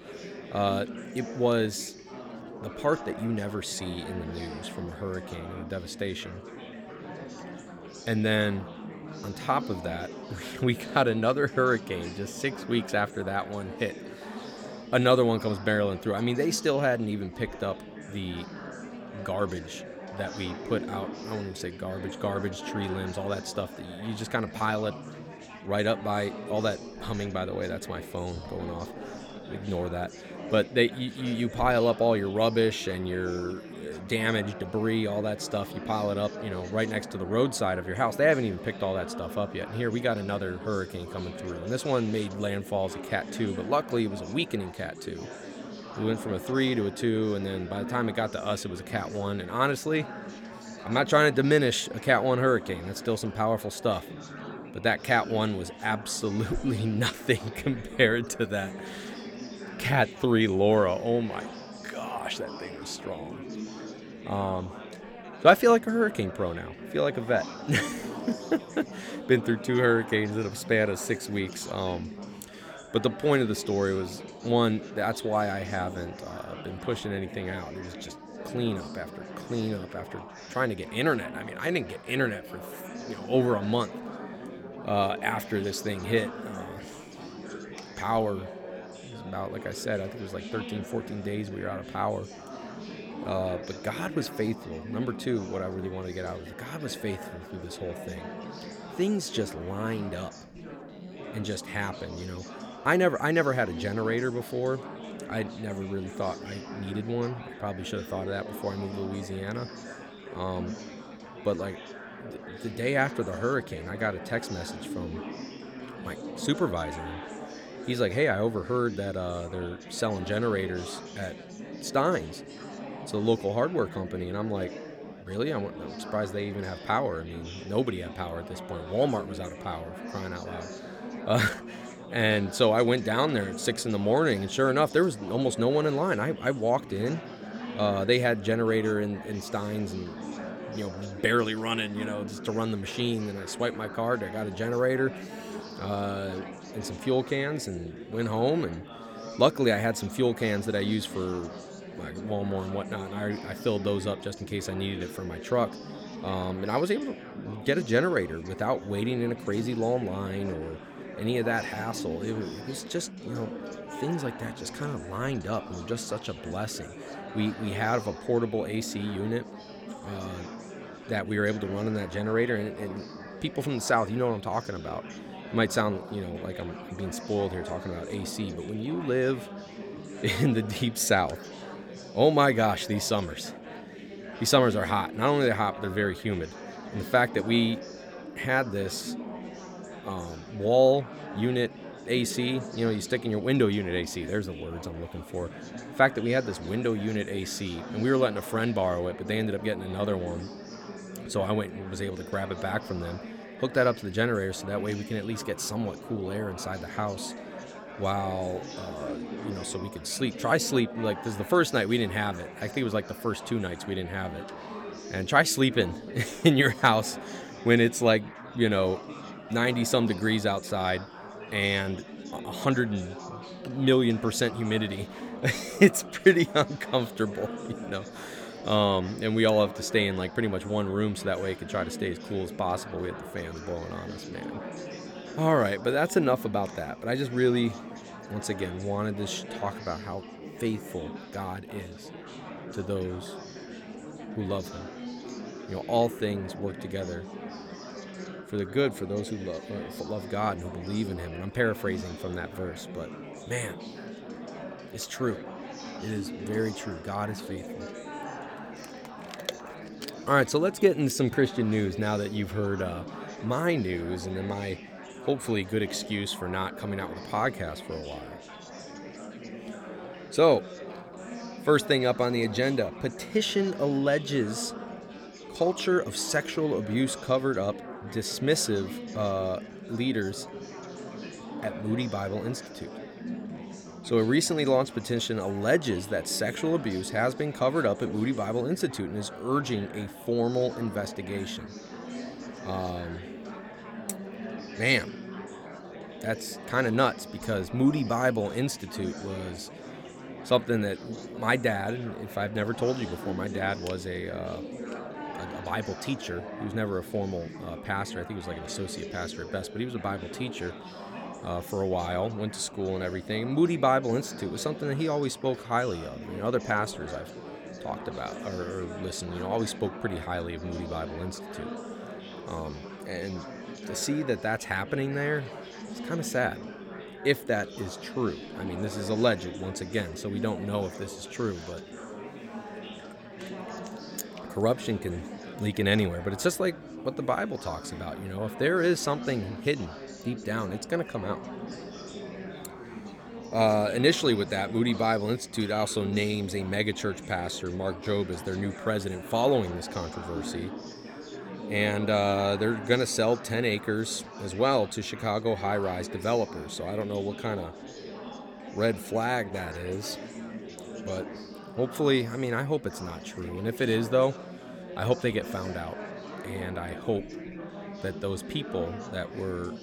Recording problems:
chatter from many people; noticeable; throughout; 10 dB below the speech

